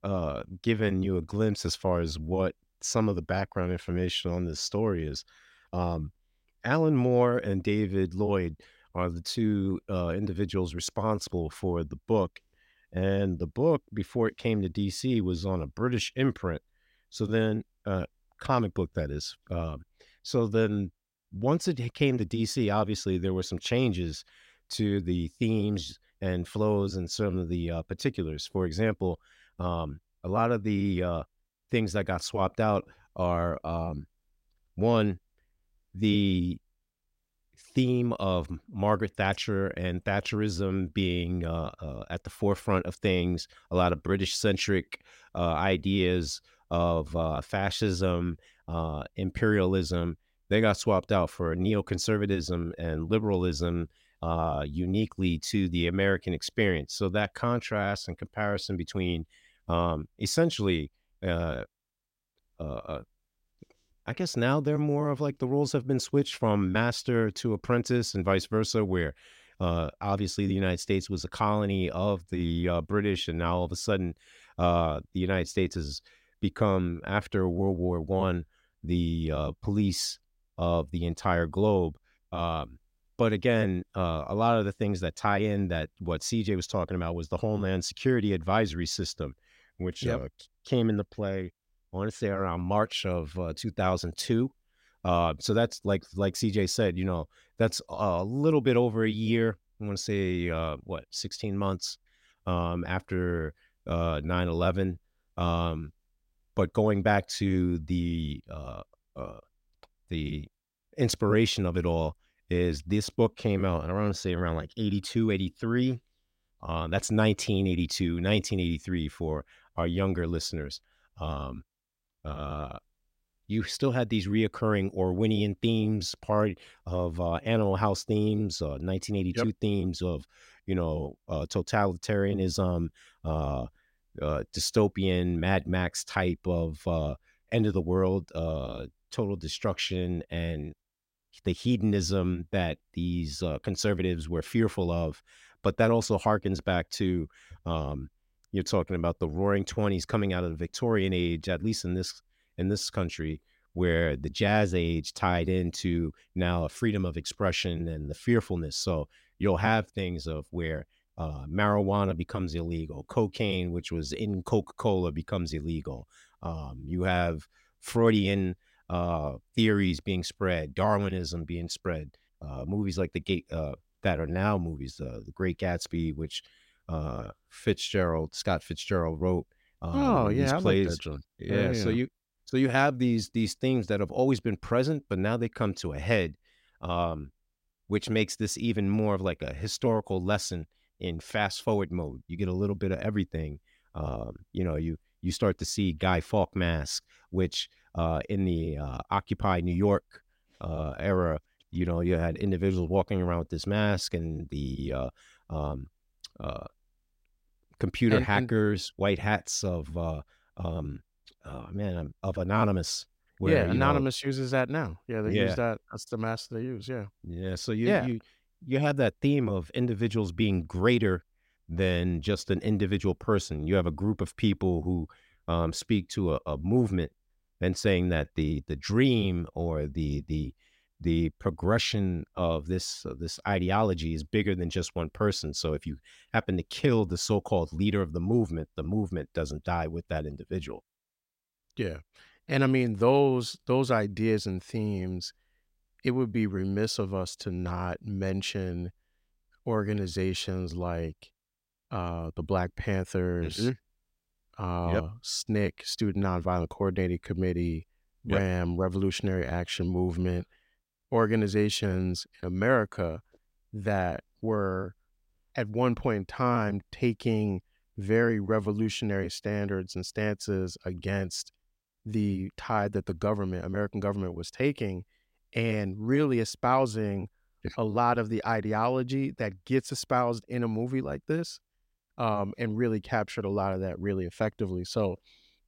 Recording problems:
none

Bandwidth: 16 kHz